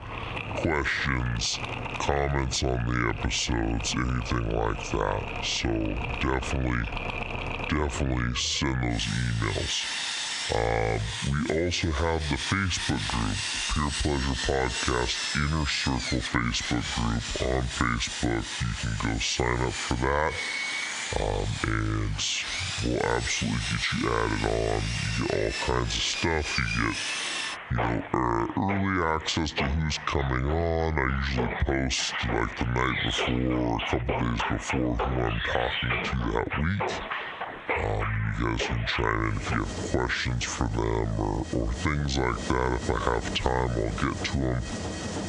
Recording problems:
squashed, flat; heavily, background pumping
wrong speed and pitch; too slow and too low; 0.7 times normal speed
machinery noise; loud; throughout; 5 dB below the speech

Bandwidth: 10 kHz